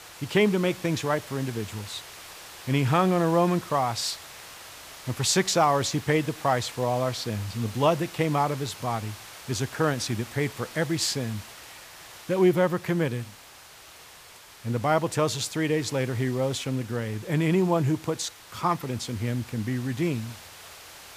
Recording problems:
hiss; noticeable; throughout; 15 dB below the speech

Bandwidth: 15 kHz